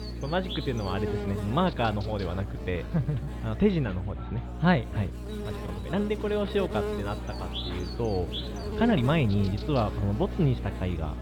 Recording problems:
muffled; slightly; fading above 4 kHz
electrical hum; loud; throughout; 60 Hz, 9 dB below the speech
chatter from many people; noticeable; throughout; 15 dB below the speech
uneven, jittery; strongly; from 1 to 9.5 s

